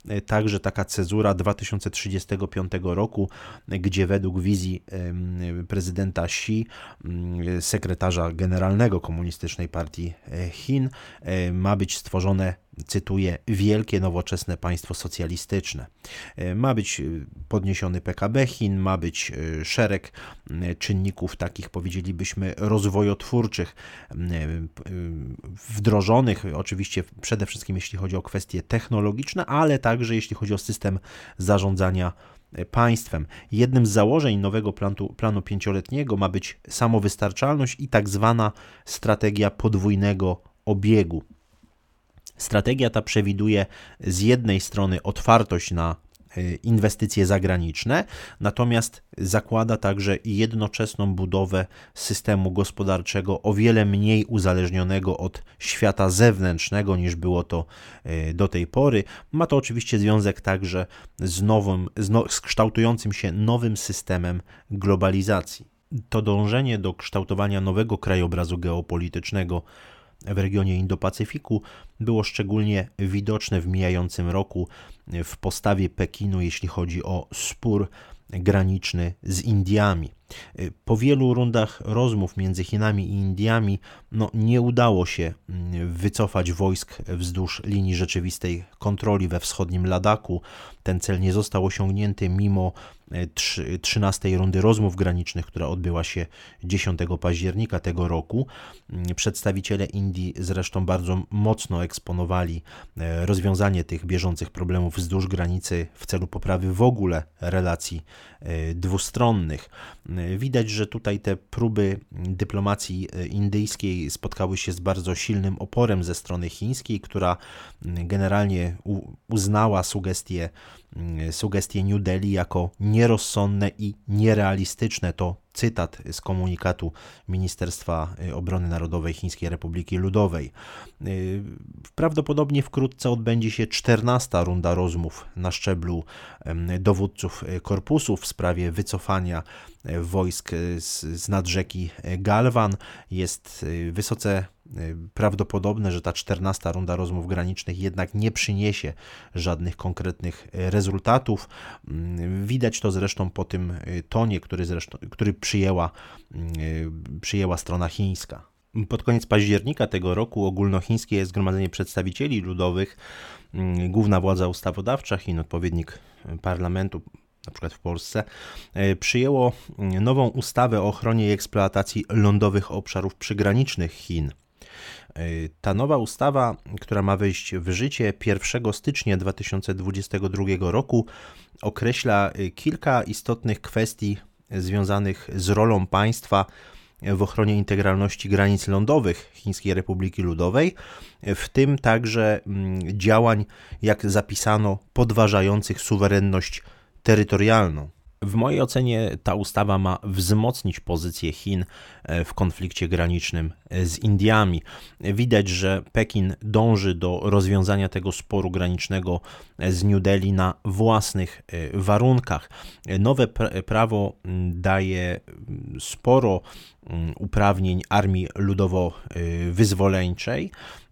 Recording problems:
none

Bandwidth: 17 kHz